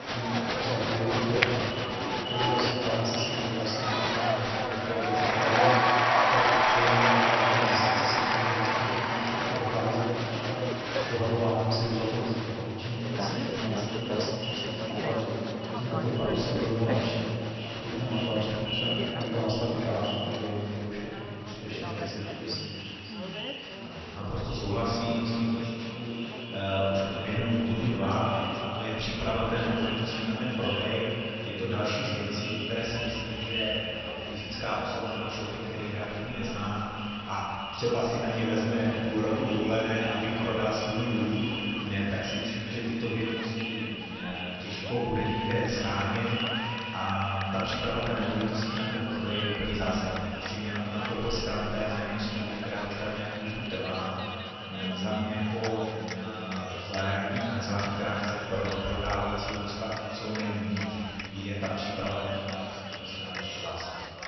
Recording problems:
echo of what is said; strong; throughout; 540 ms later, 7 dB below the speech
room echo; strong; dies away in 2.3 s
off-mic speech; far
garbled, watery; slightly; nothing above 6 kHz
crowd noise; loud; throughout; as loud as the speech

